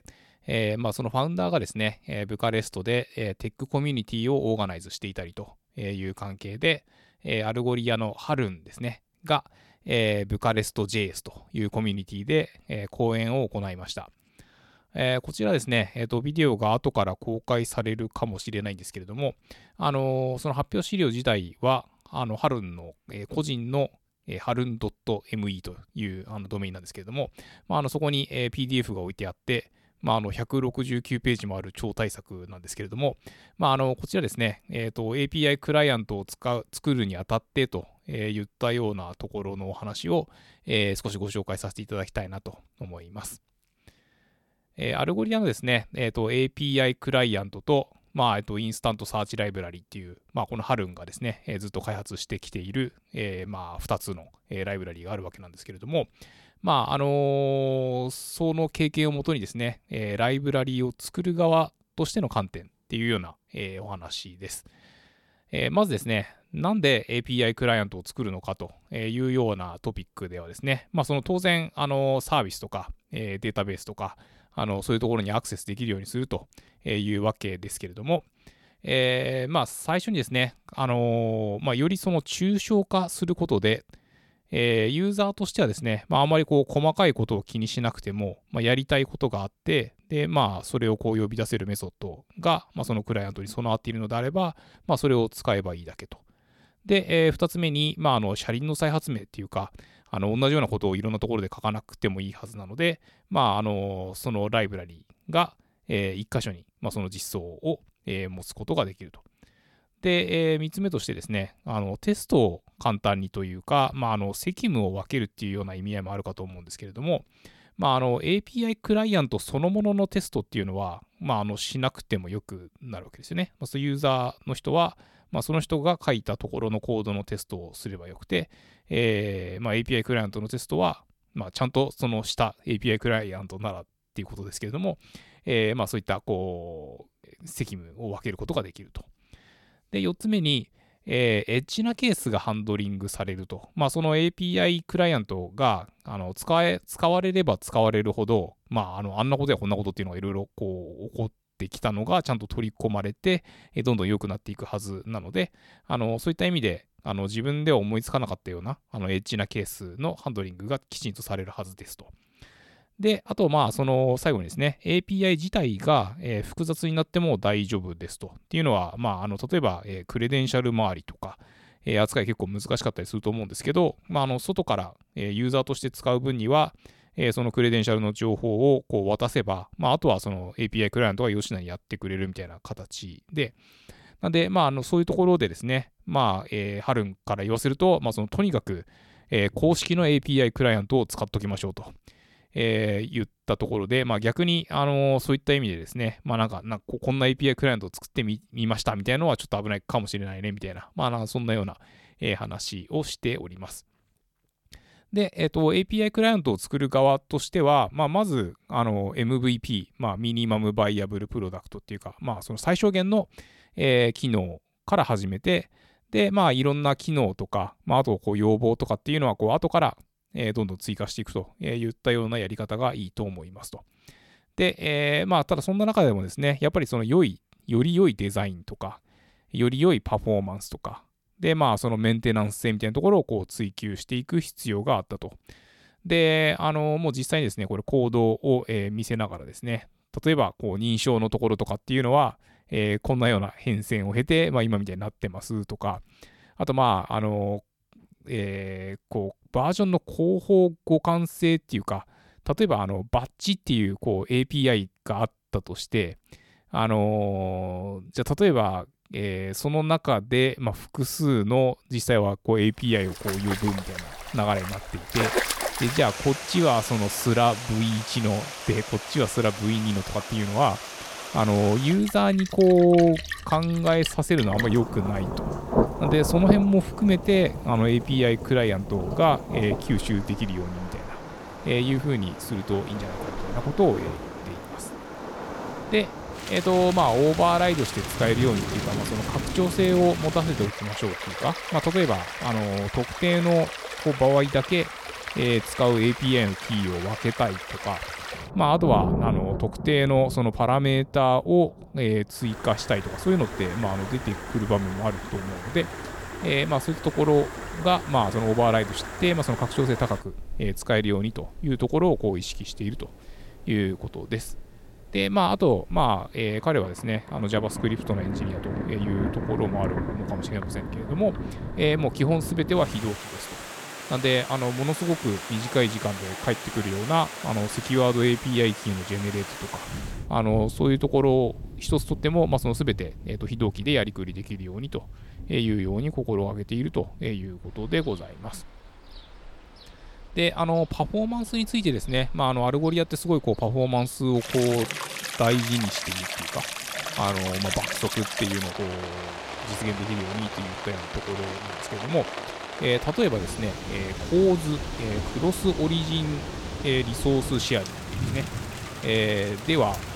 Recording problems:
rain or running water; loud; from 4:23 on; 8 dB below the speech

